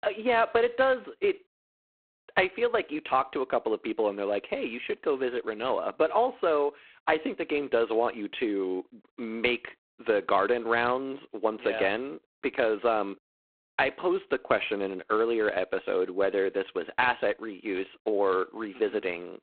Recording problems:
phone-call audio; poor line; nothing above 4 kHz

